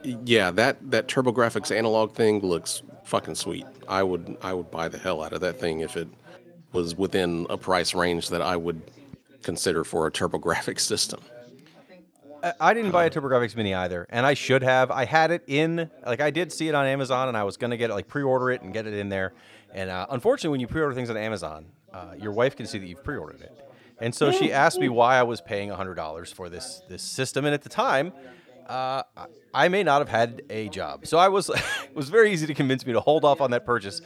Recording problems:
background chatter; faint; throughout; 3 voices, 25 dB below the speech

